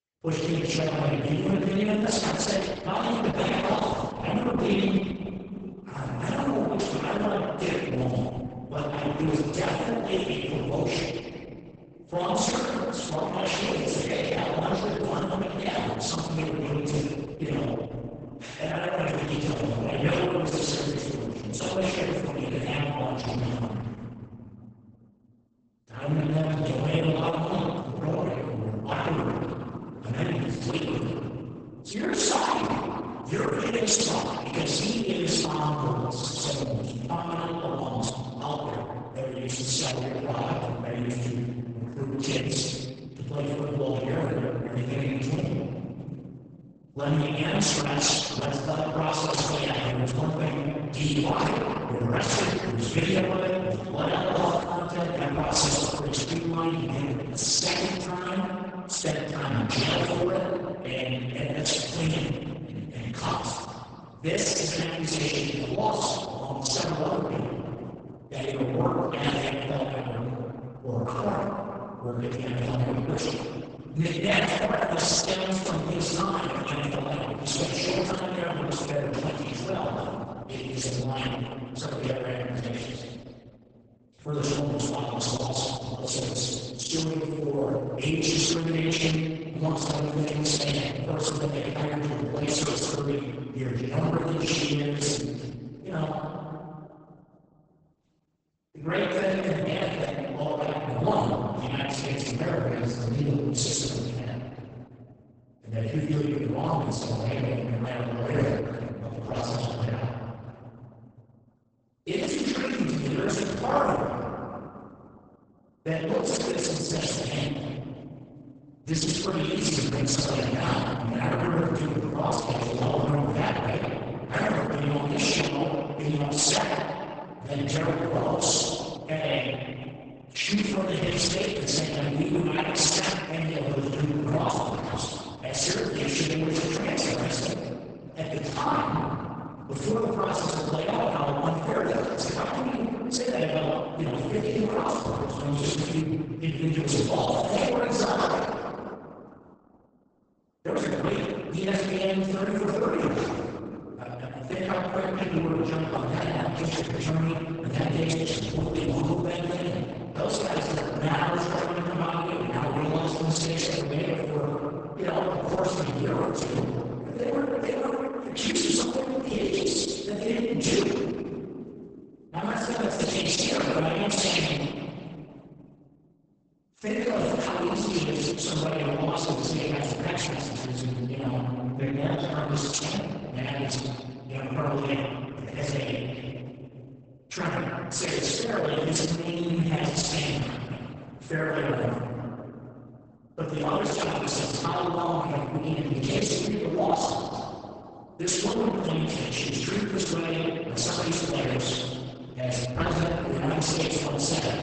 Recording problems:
room echo; strong; dies away in 2.3 s
off-mic speech; far
garbled, watery; badly; nothing above 8 kHz

